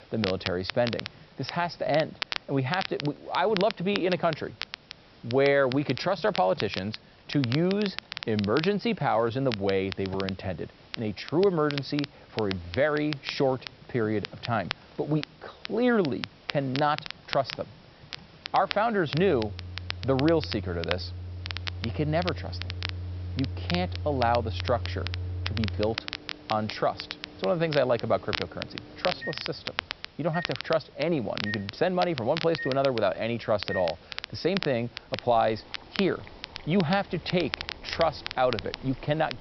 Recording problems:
high frequencies cut off; noticeable; nothing above 5.5 kHz
crackle, like an old record; loud; 9 dB below the speech
household noises; noticeable; throughout; 10 dB below the speech
hiss; faint; throughout; 25 dB below the speech

